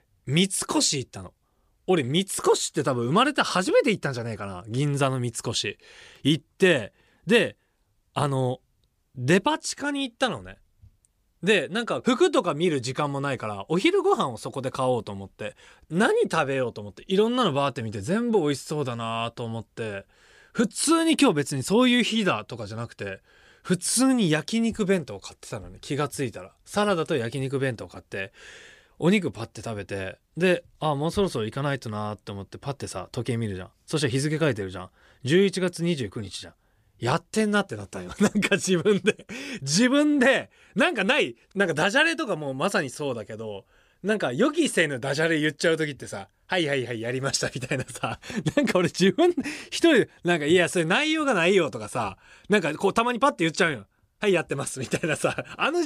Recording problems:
abrupt cut into speech; at the end

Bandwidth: 15 kHz